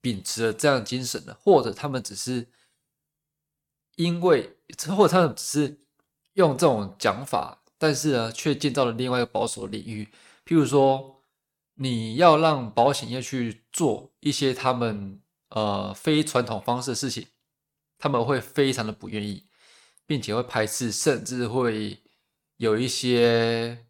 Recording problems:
none

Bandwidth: 17 kHz